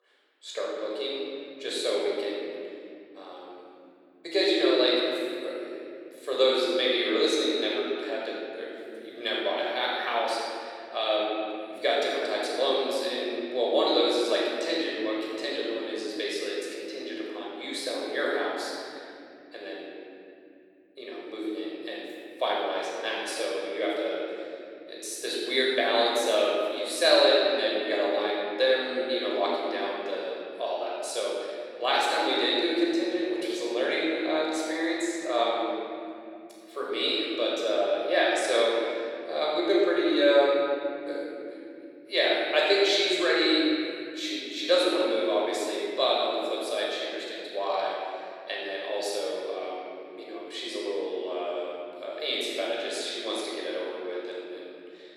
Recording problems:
room echo; strong; dies away in 3 s
off-mic speech; far
thin; very; fading below 350 Hz

